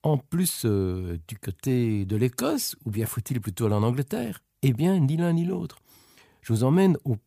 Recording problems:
none

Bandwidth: 15 kHz